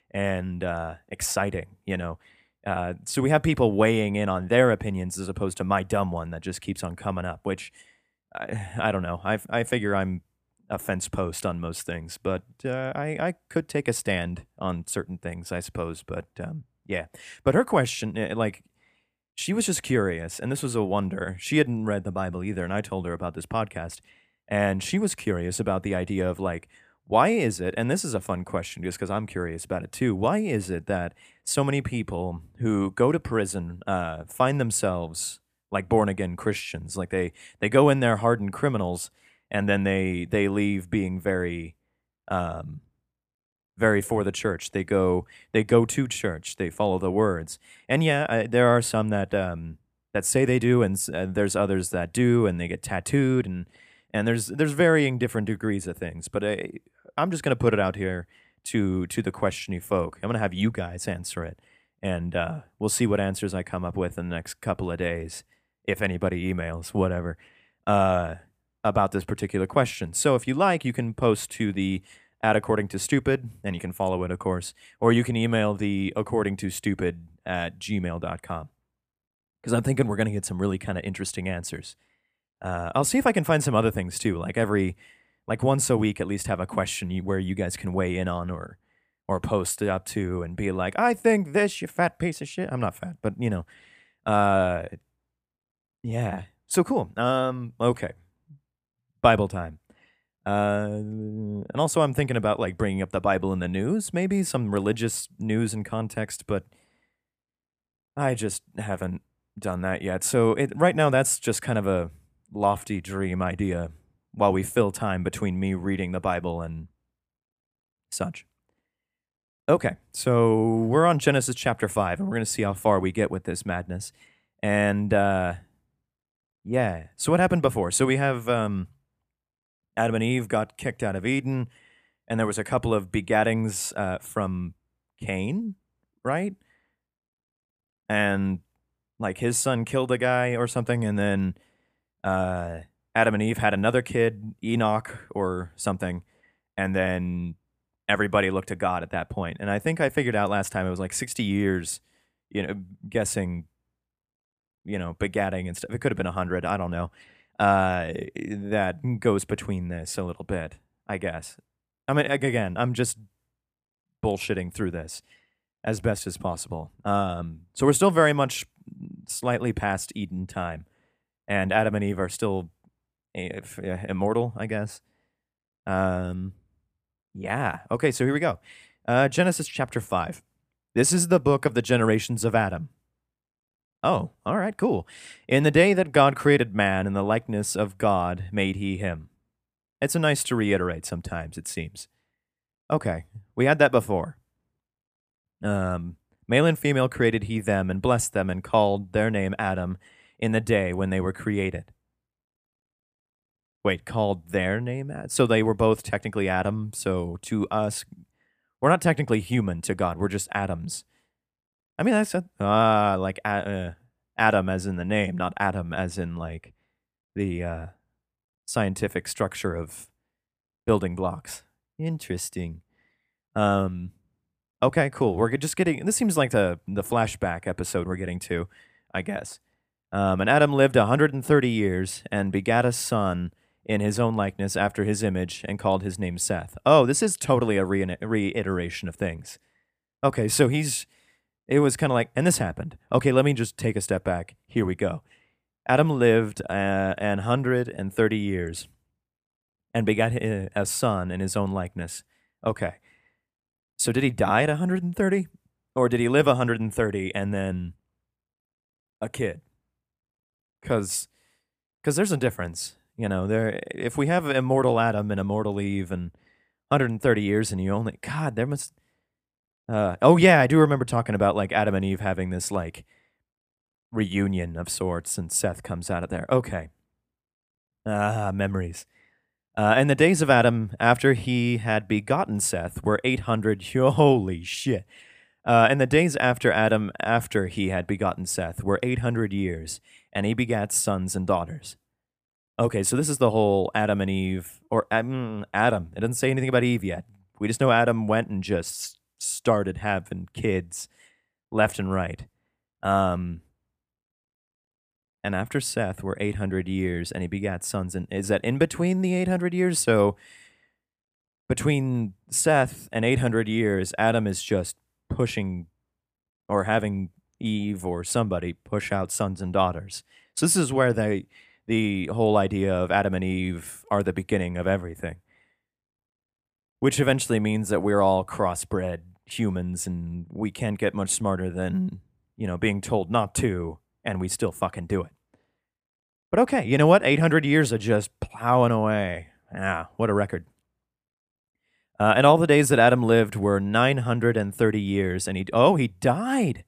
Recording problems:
none

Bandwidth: 15 kHz